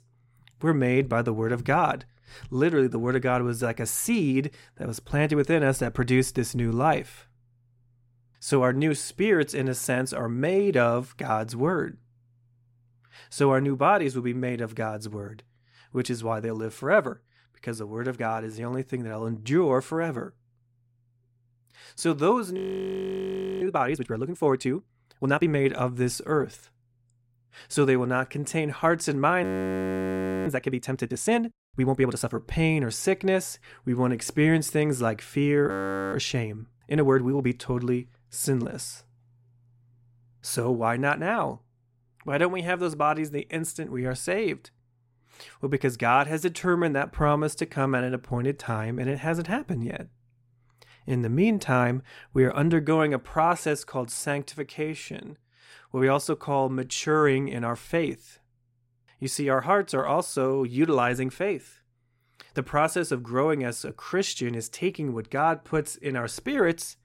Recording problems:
audio freezing; at 23 s for 1 s, at 29 s for 1 s and at 36 s

